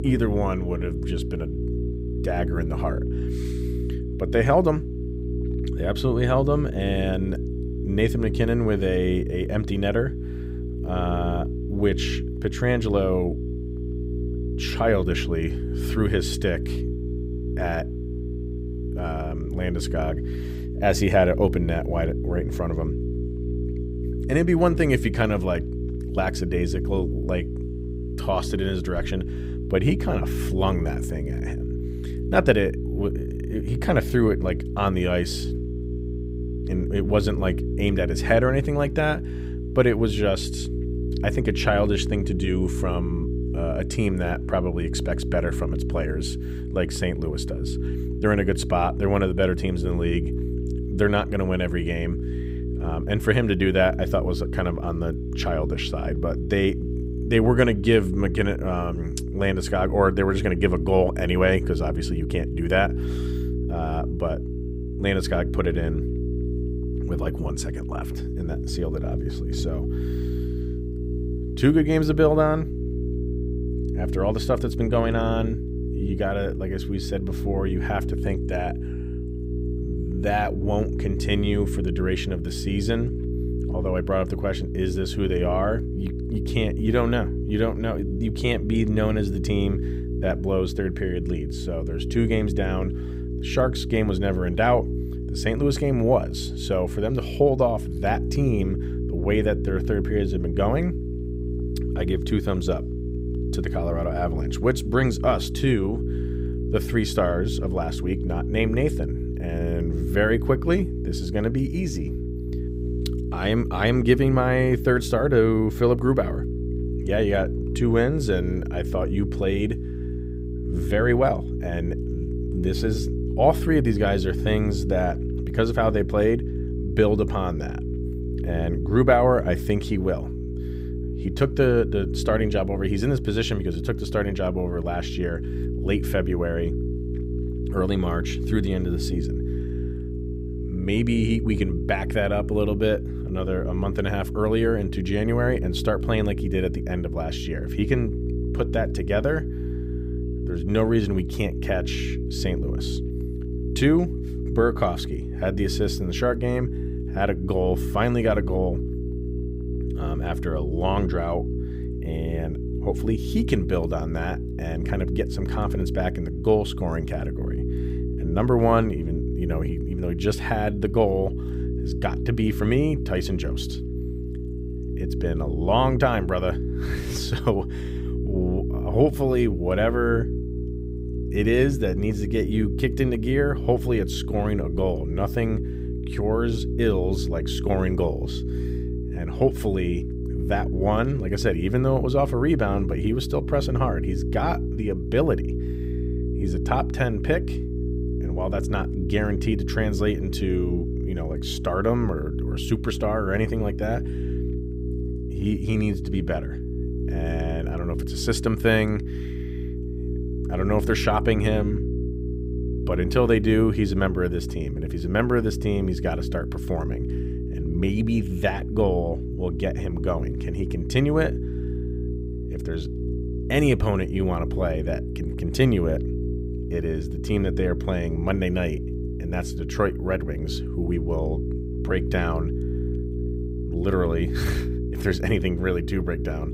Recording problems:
electrical hum; loud; throughout; 60 Hz, 10 dB below the speech

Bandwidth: 15.5 kHz